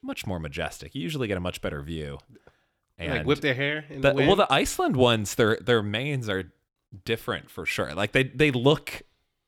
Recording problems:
none

